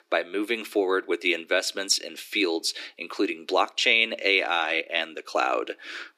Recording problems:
thin; very; fading below 300 Hz

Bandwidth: 15 kHz